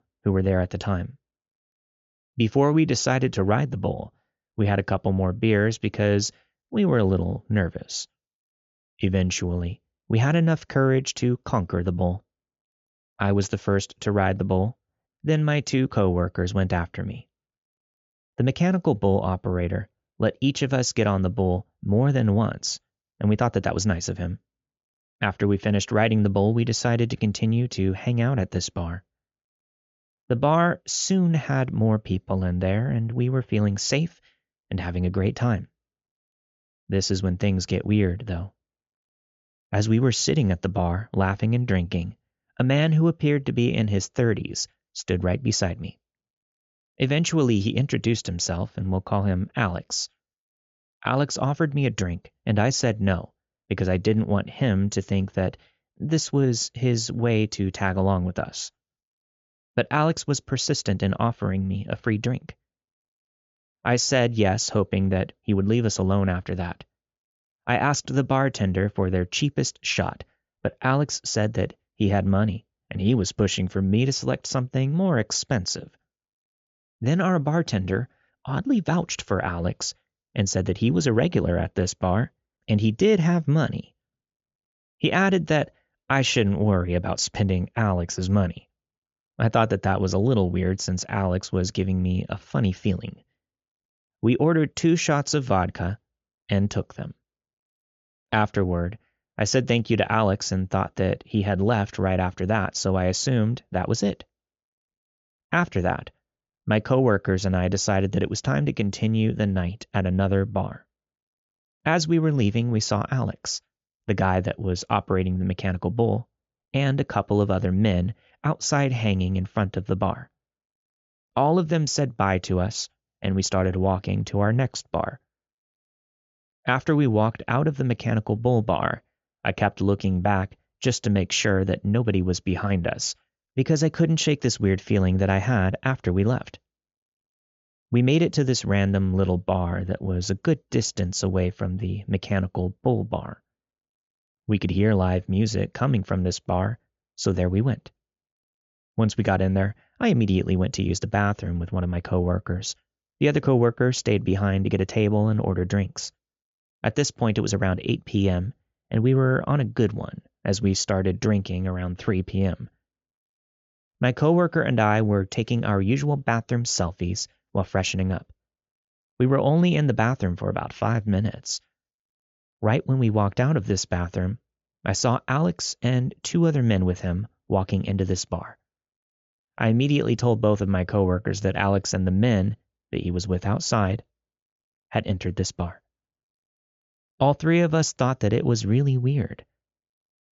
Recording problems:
high frequencies cut off; noticeable; nothing above 7.5 kHz

